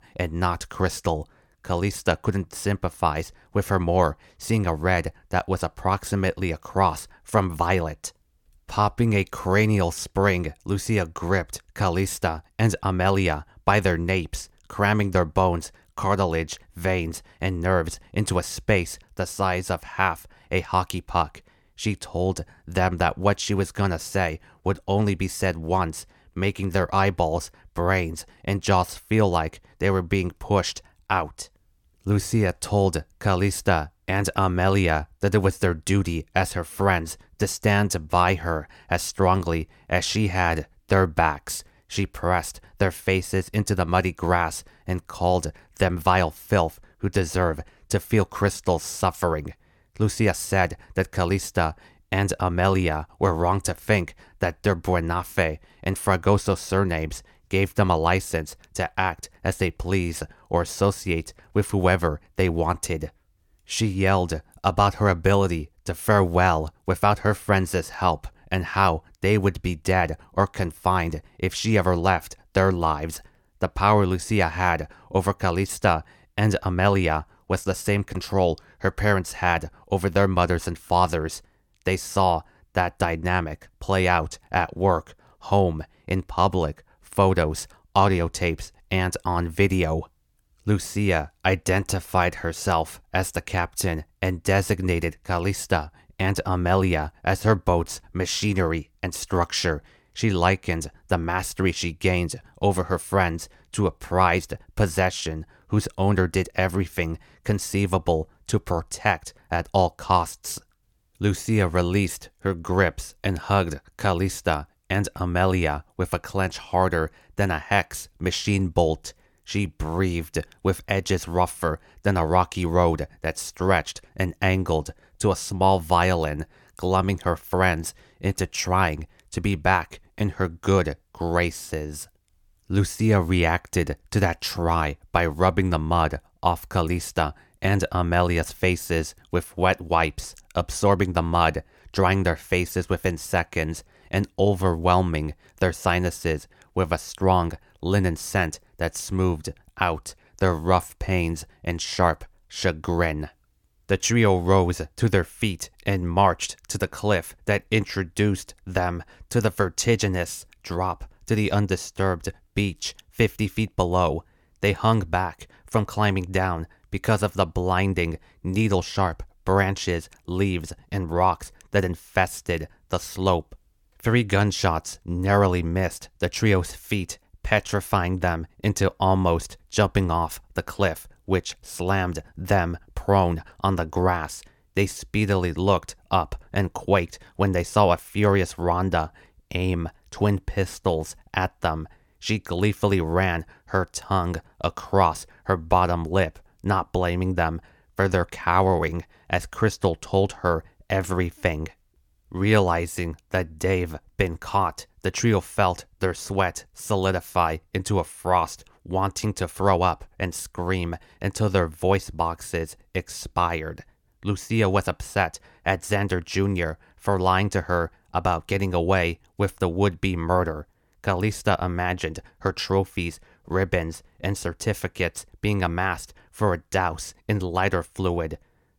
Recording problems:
none

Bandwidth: 17.5 kHz